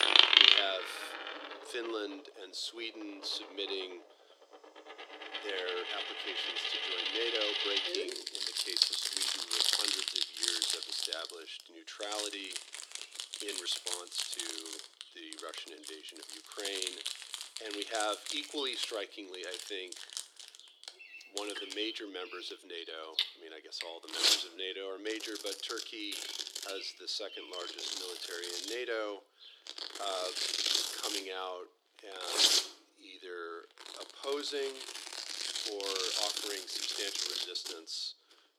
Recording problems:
thin; very; fading below 300 Hz
household noises; very loud; throughout; 8 dB above the speech
animal sounds; noticeable; throughout; 10 dB below the speech

